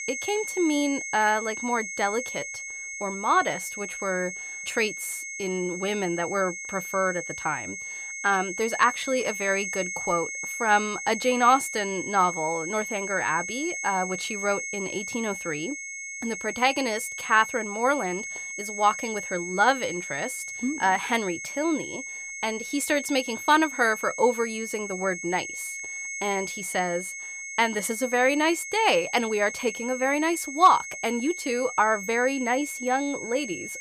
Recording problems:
high-pitched whine; loud; throughout; 2 kHz, 7 dB below the speech

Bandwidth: 15 kHz